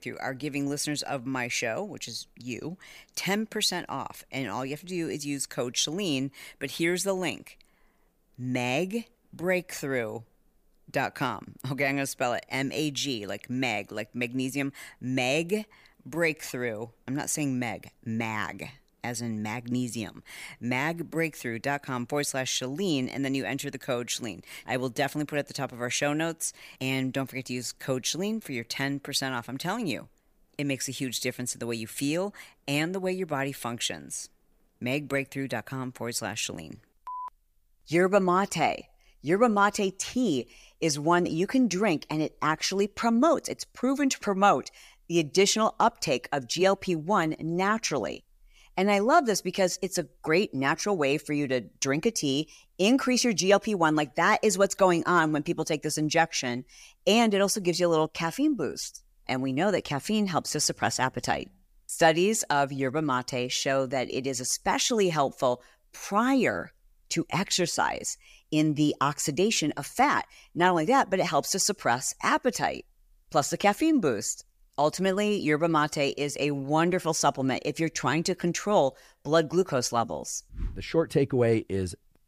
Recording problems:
none

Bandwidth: 15 kHz